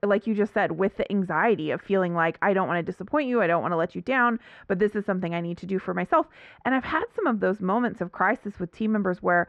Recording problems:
muffled; very; fading above 1.5 kHz

